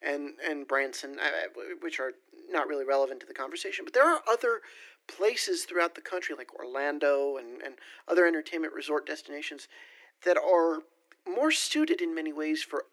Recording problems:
thin; somewhat; fading below 300 Hz

